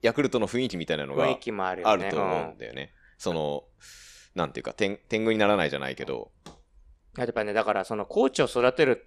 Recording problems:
none

